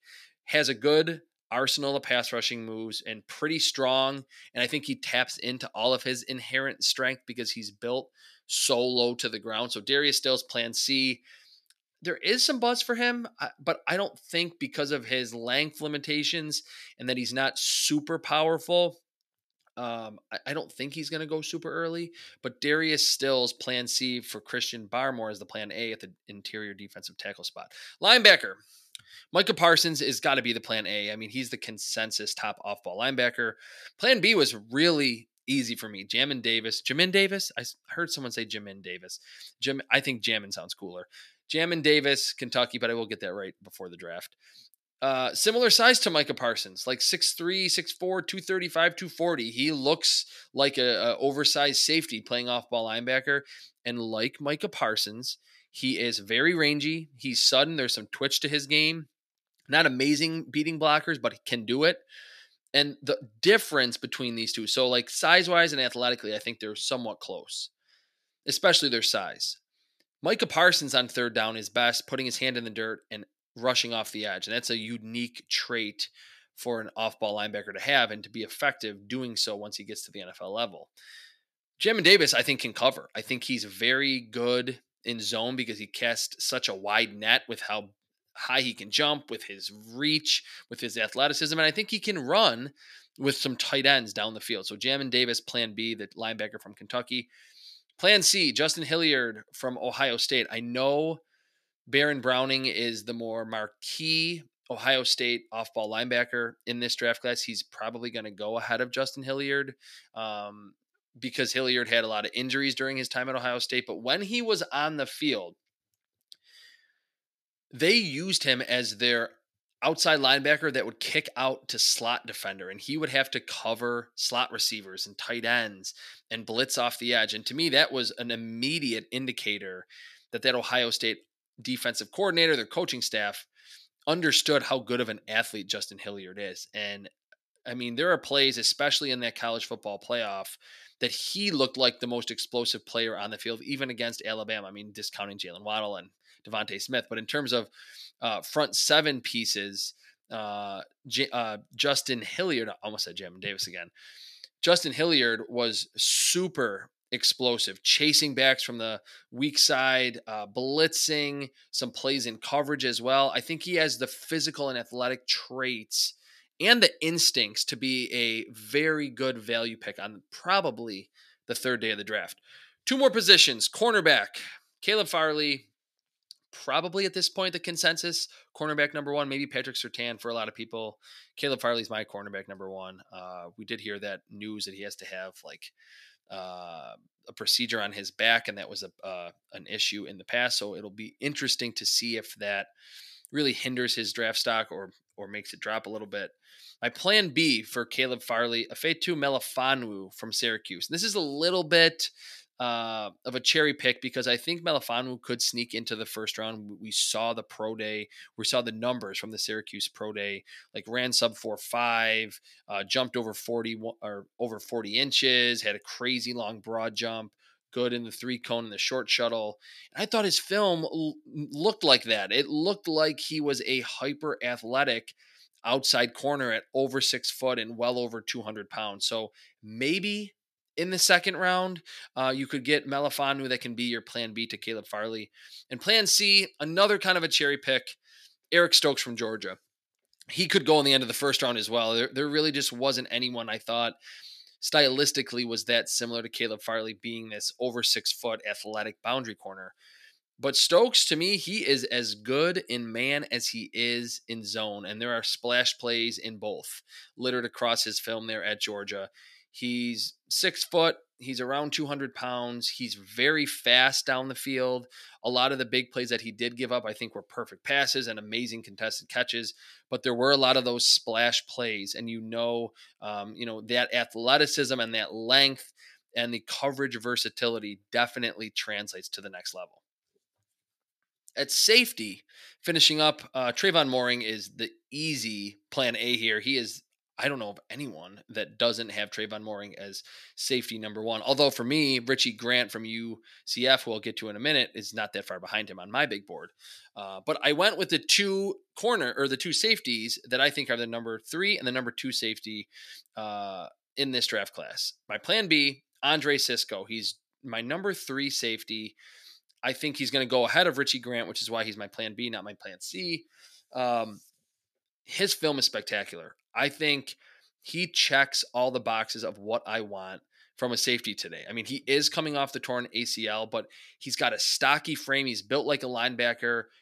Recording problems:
thin; very slightly; fading below 300 Hz

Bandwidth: 14.5 kHz